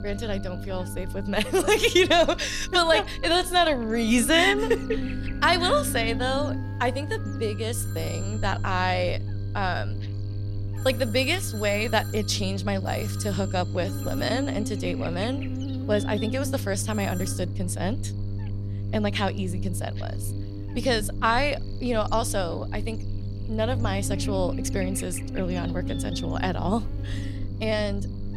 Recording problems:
electrical hum; noticeable; throughout; 50 Hz, 15 dB below the speech
alarms or sirens; noticeable; until 17 s; 20 dB below the speech
low rumble; faint; throughout; 20 dB below the speech

